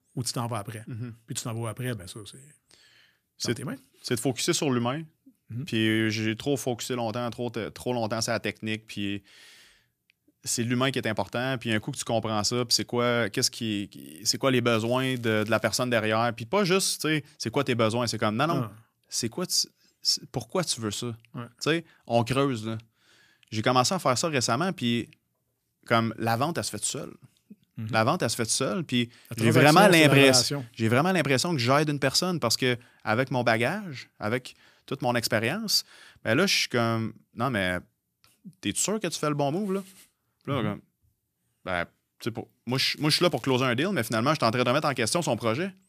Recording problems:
crackling; faint; at 15 s and at 43 s; 25 dB below the speech

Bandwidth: 14.5 kHz